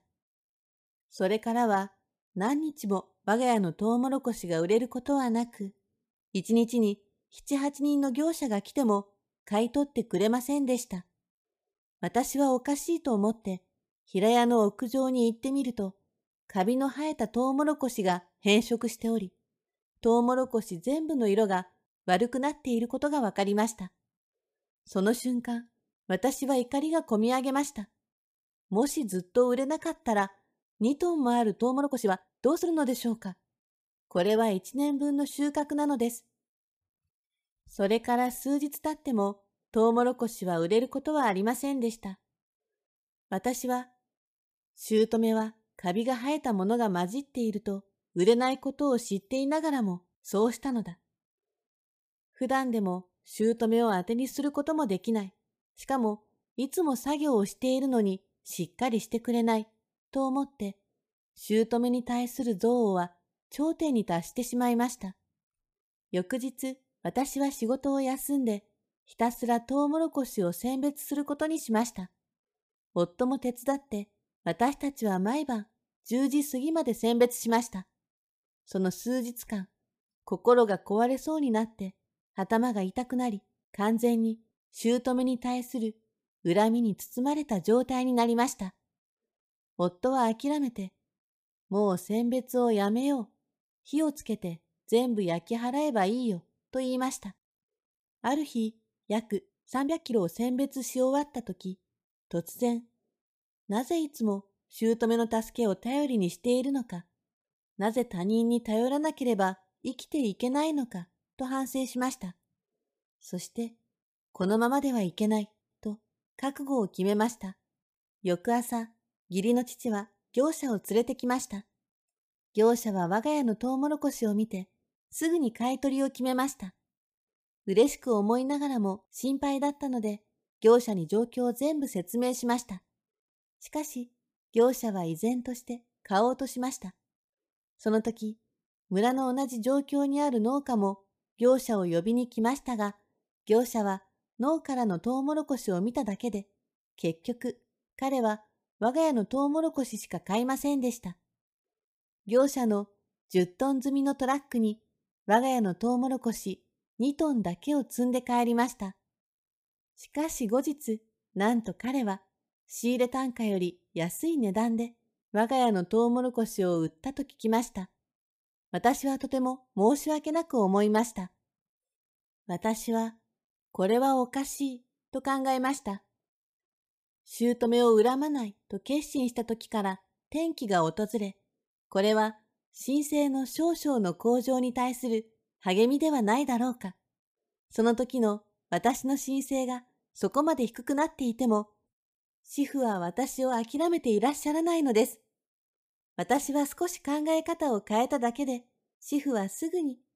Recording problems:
uneven, jittery; strongly; from 5 s to 2:53

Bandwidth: 15 kHz